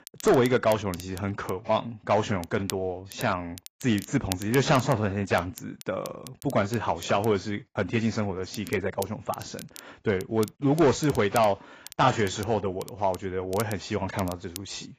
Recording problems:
garbled, watery; badly; nothing above 7.5 kHz
distortion; slight; 1.8% of the sound clipped
crackle, like an old record; noticeable; 15 dB below the speech

